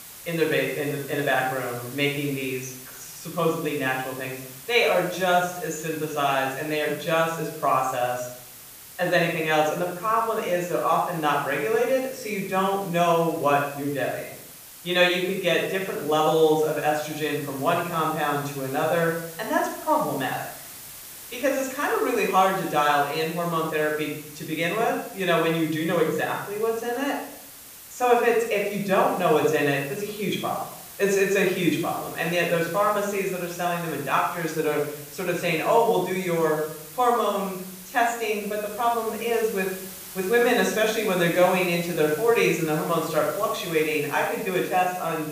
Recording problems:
off-mic speech; far
room echo; noticeable; dies away in 0.6 s
hiss; noticeable; throughout; 15 dB below the speech

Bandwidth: 15 kHz